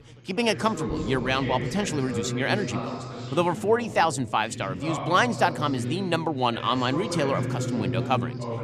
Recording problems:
background chatter; loud; throughout; 3 voices, 6 dB below the speech

